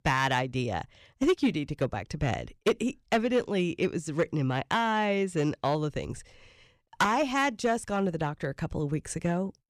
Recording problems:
distortion; slight; 3% of the sound clipped

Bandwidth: 14.5 kHz